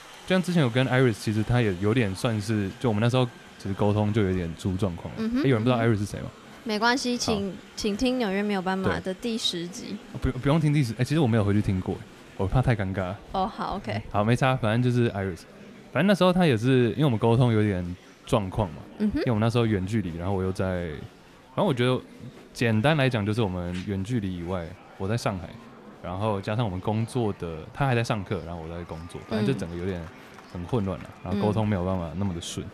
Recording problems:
murmuring crowd; faint; throughout; 20 dB below the speech

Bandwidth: 14.5 kHz